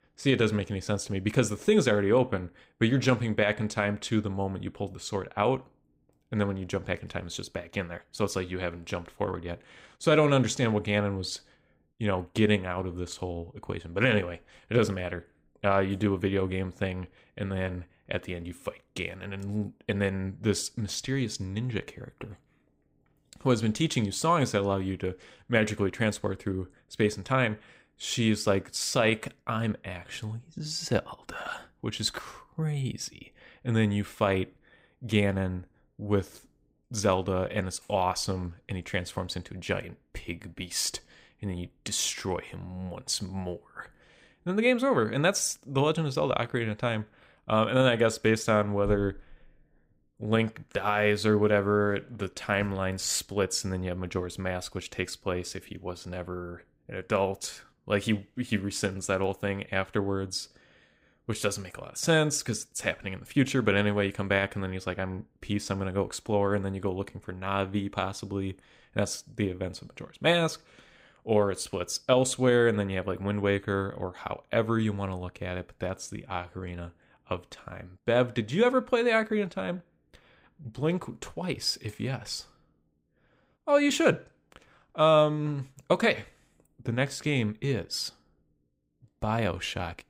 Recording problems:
none

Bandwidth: 15.5 kHz